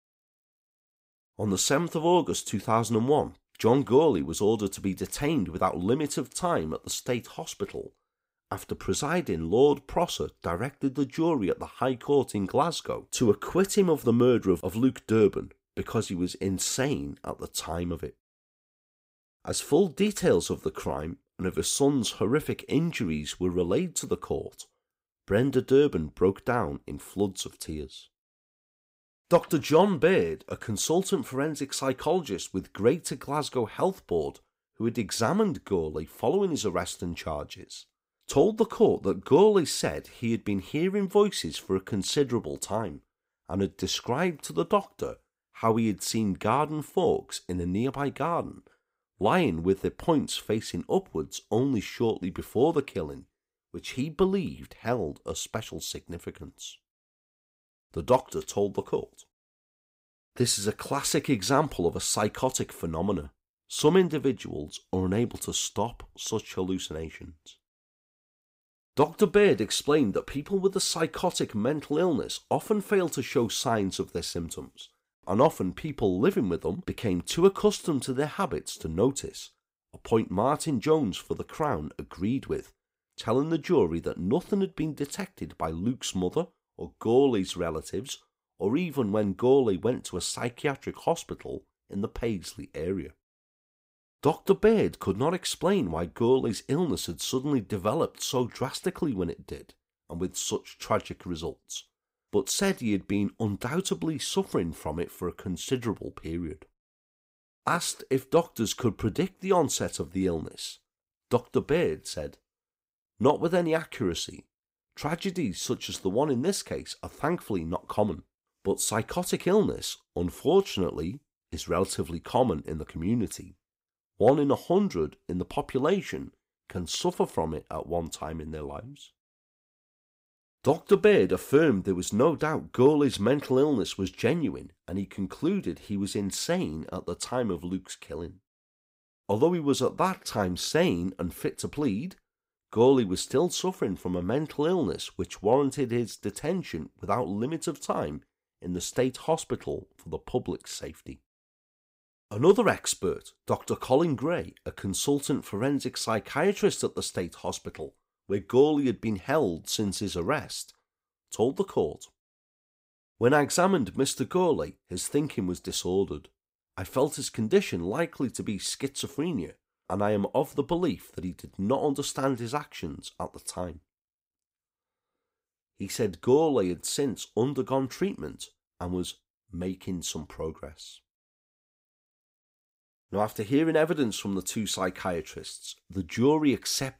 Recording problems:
none

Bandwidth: 15.5 kHz